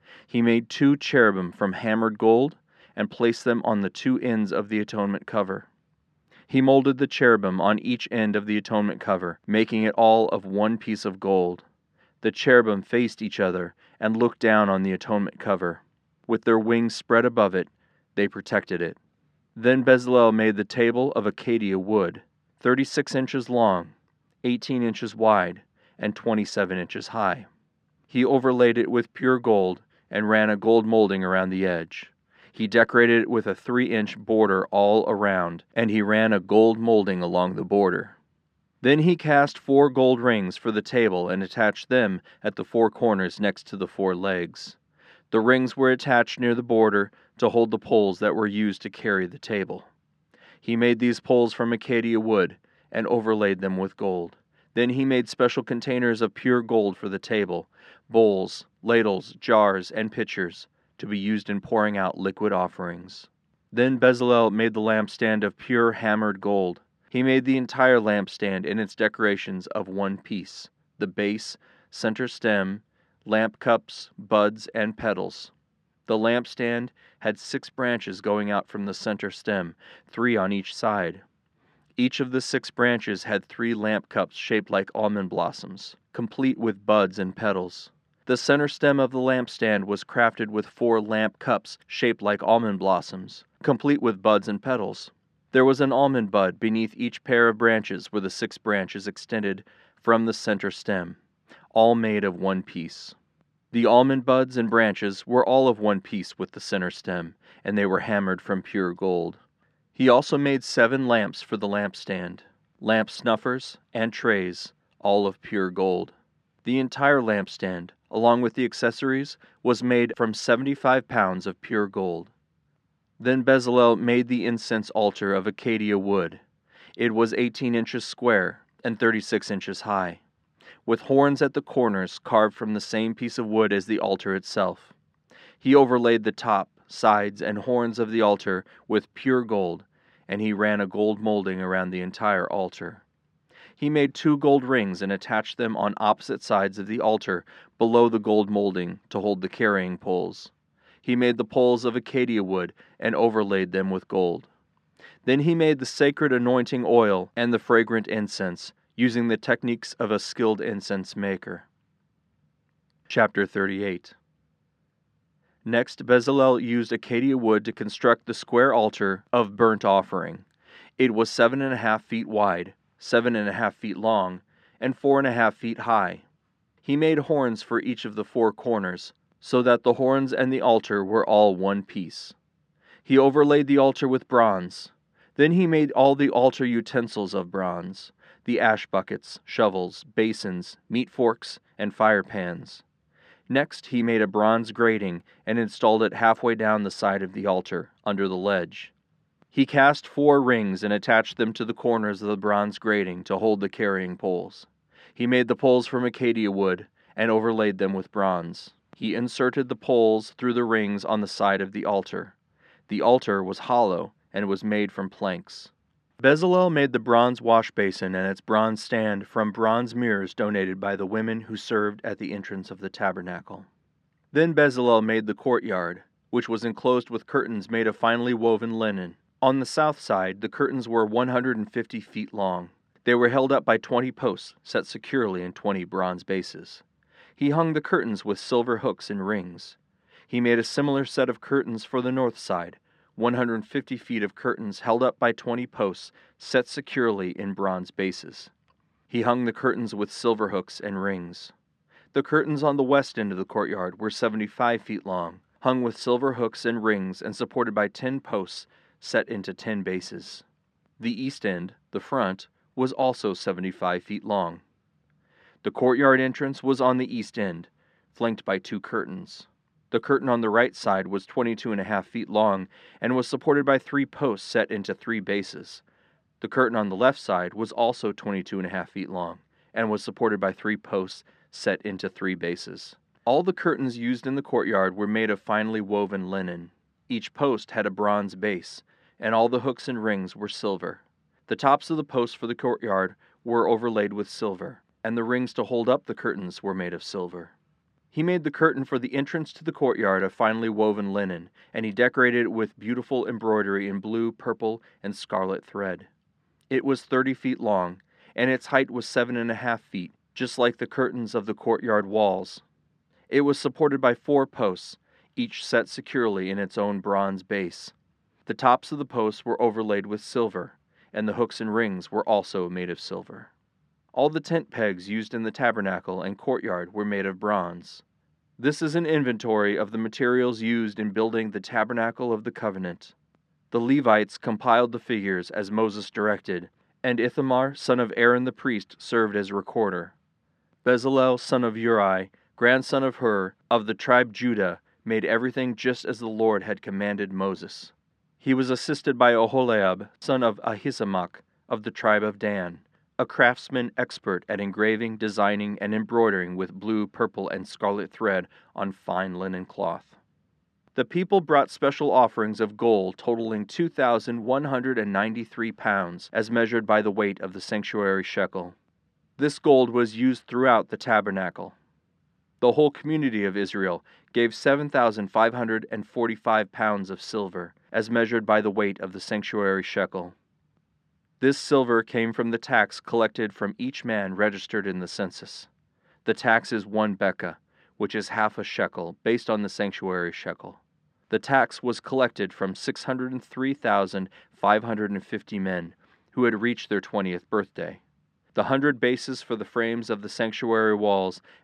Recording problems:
muffled; slightly; fading above 3 kHz

